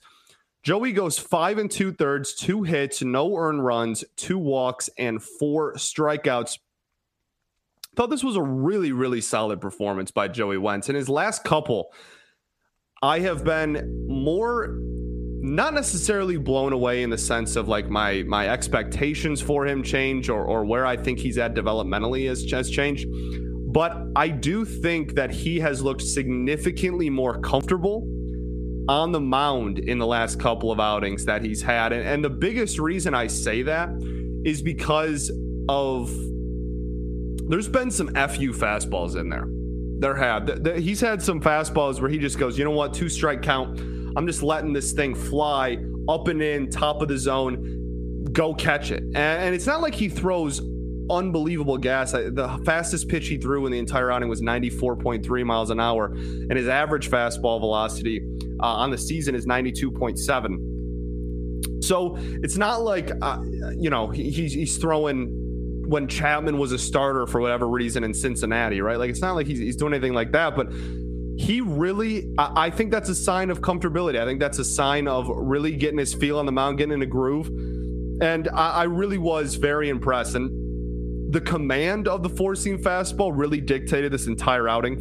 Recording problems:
squashed, flat; heavily
electrical hum; noticeable; from 13 s on; 60 Hz, 20 dB below the speech

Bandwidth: 14.5 kHz